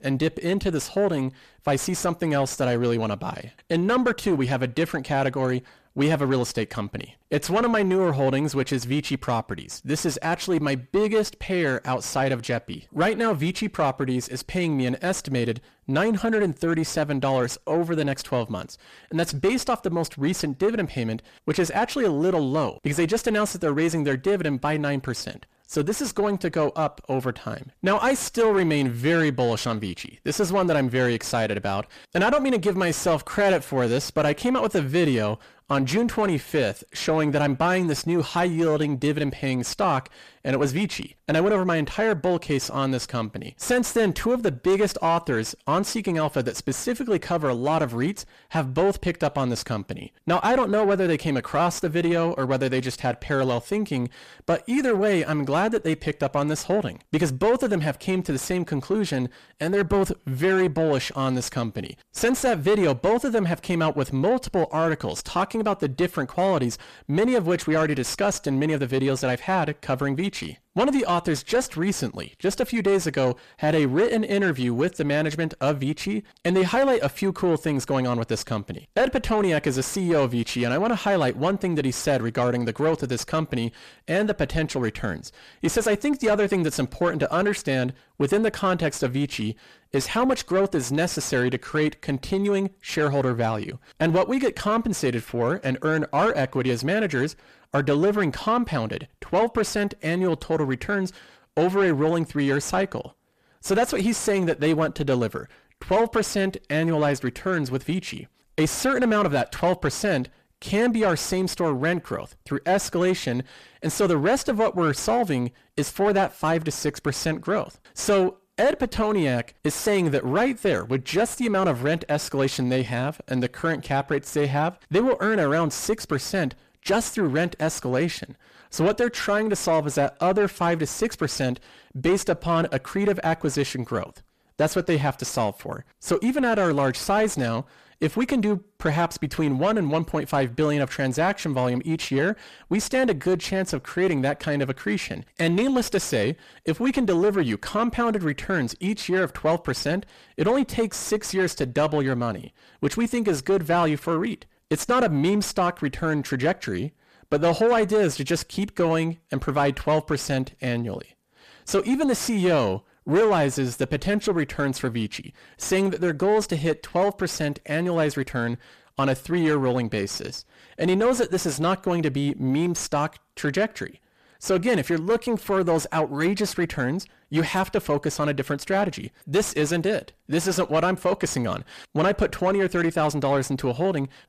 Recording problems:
distortion; slight; 10 dB below the speech

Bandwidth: 14.5 kHz